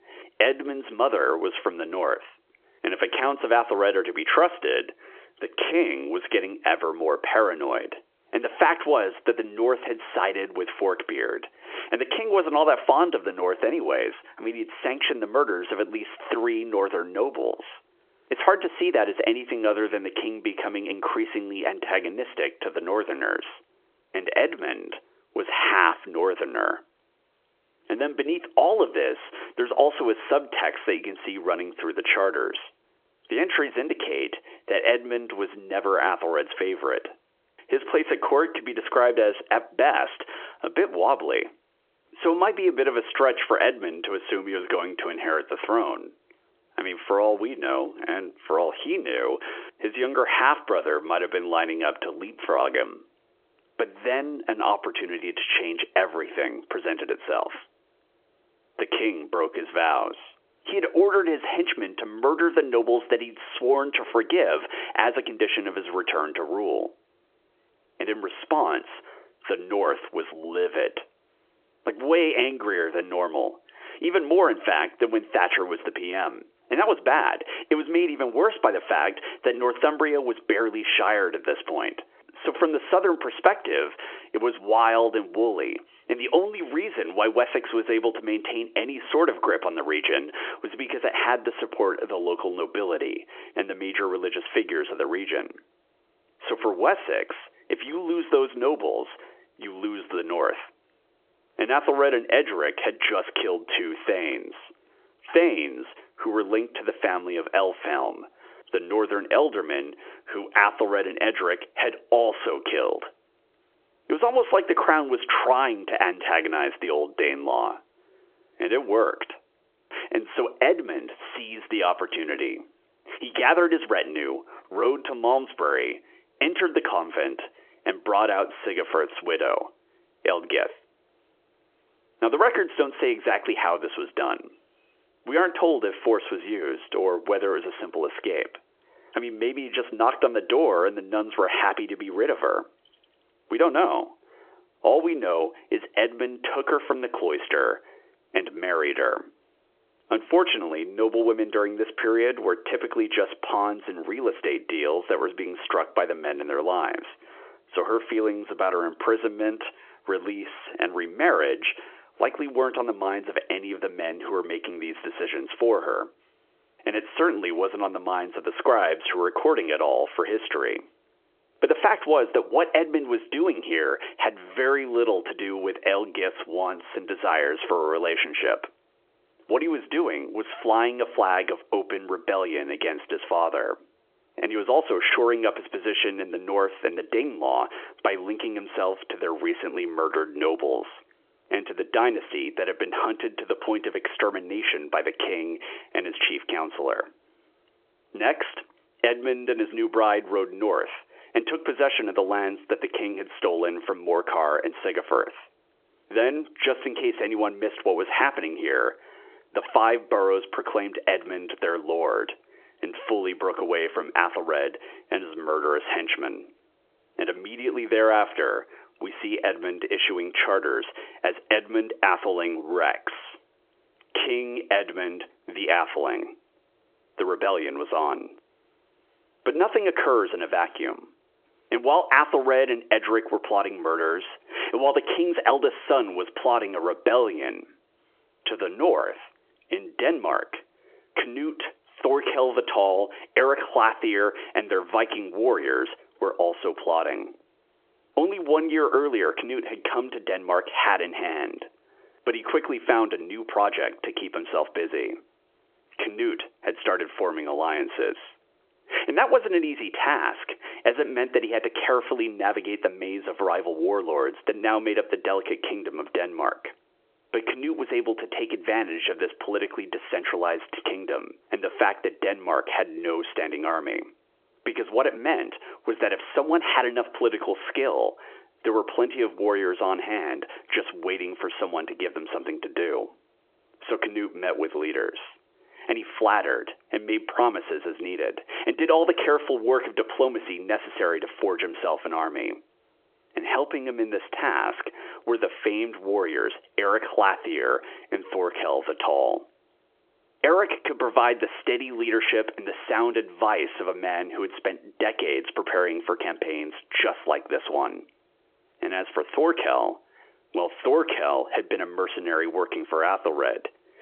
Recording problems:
squashed, flat; heavily
phone-call audio; nothing above 3.5 kHz

